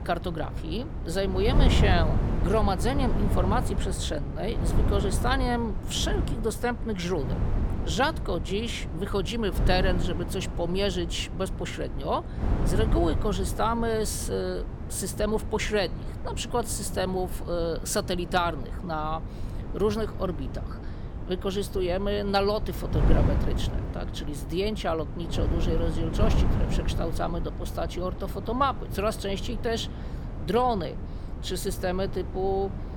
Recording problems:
wind noise on the microphone; heavy; 10 dB below the speech

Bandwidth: 17.5 kHz